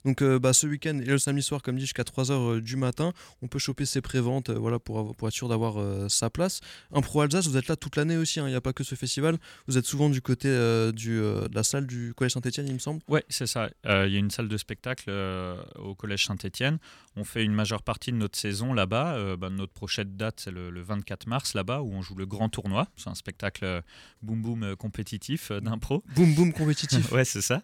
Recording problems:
none

